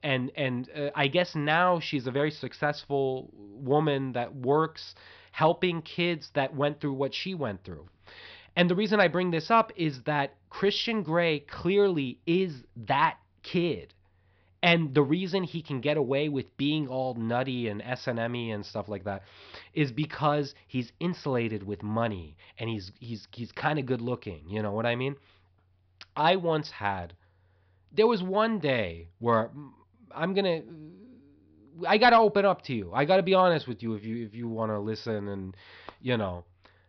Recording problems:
high frequencies cut off; noticeable; nothing above 5.5 kHz

